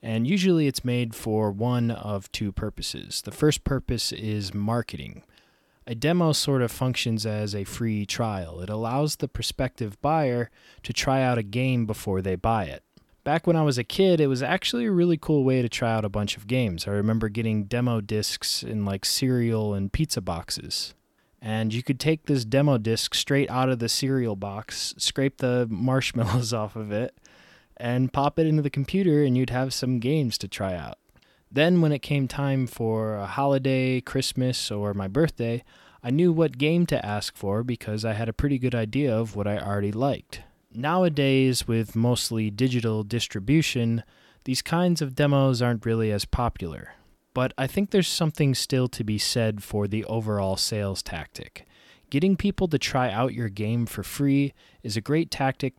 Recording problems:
none

